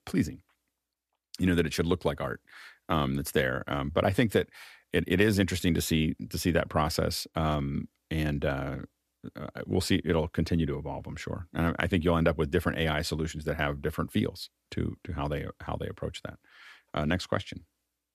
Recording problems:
none

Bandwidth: 14.5 kHz